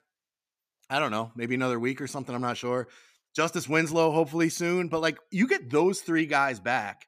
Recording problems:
none

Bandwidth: 15 kHz